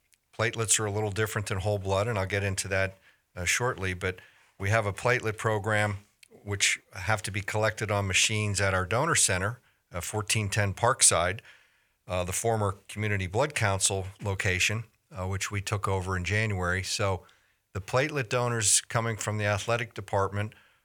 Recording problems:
none

